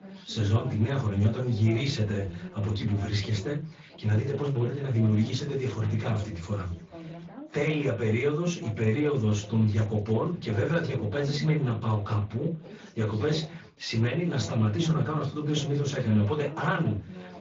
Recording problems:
off-mic speech; far
high frequencies cut off; noticeable; nothing above 7 kHz
room echo; very slight; dies away in 0.3 s
garbled, watery; slightly
background chatter; noticeable; throughout; 3 voices, 15 dB below the speech

